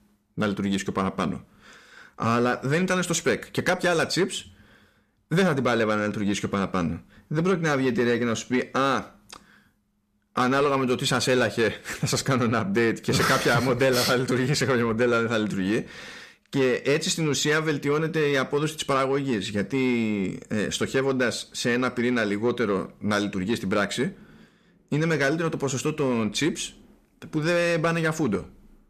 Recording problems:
distortion; slight; 10 dB below the speech

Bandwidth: 14.5 kHz